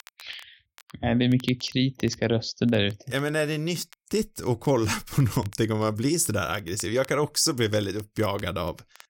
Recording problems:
crackle, like an old record; faint; 25 dB below the speech

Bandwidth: 16.5 kHz